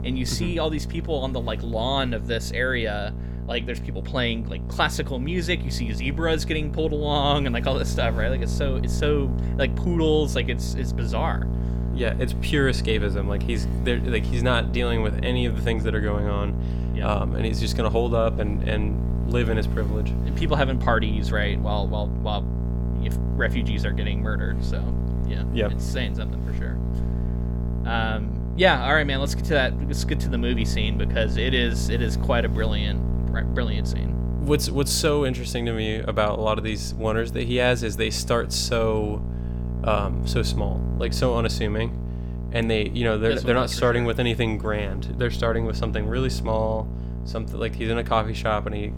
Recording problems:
electrical hum; noticeable; throughout; 60 Hz, 15 dB below the speech

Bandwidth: 17 kHz